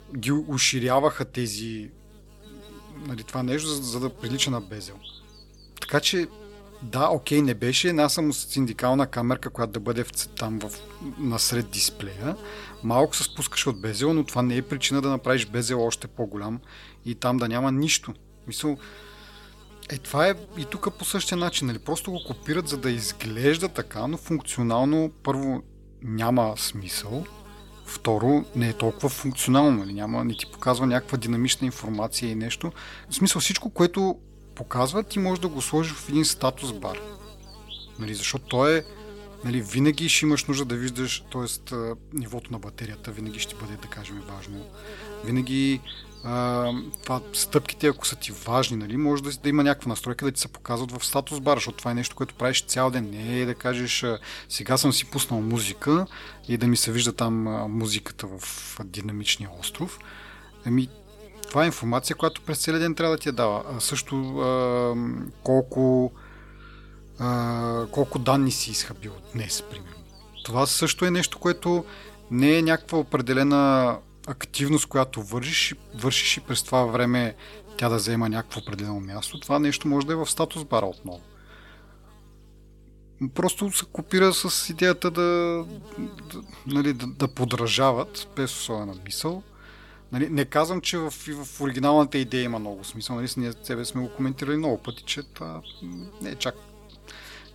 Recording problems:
electrical hum; faint; throughout; 50 Hz, 20 dB below the speech

